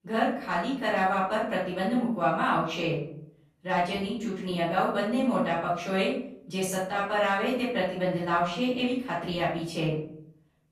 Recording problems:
off-mic speech; far
room echo; noticeable; dies away in 0.6 s

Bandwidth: 15 kHz